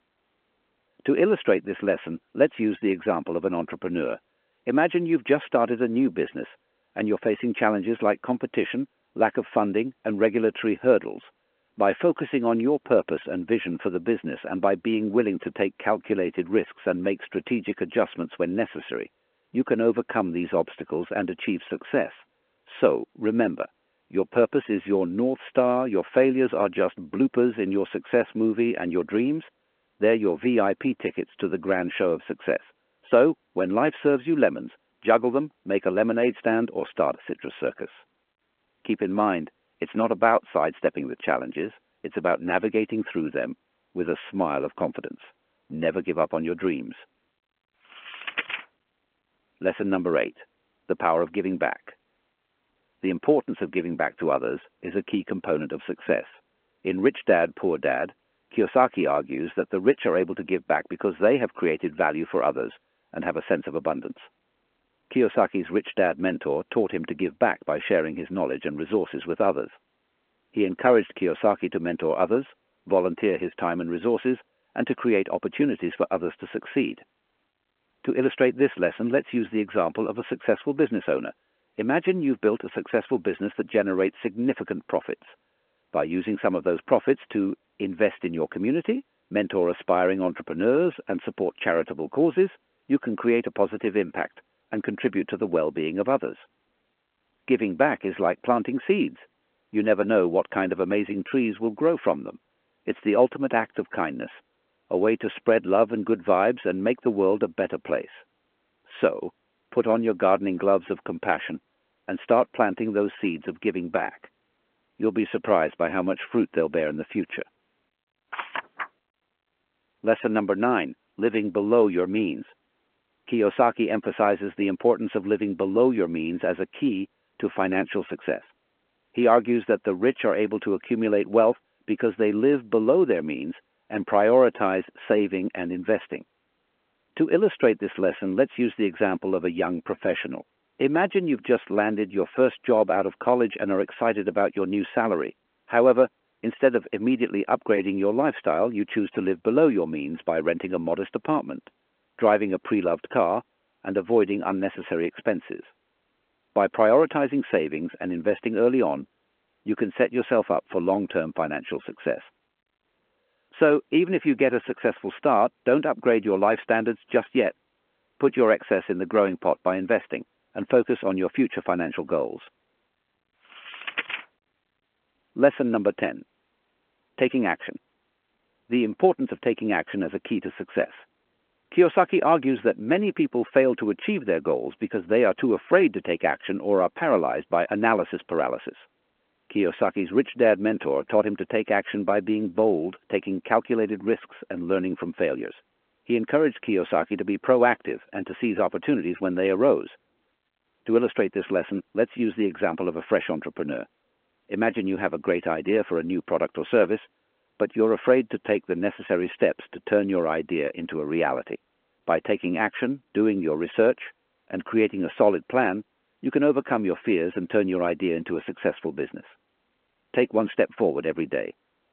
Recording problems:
phone-call audio

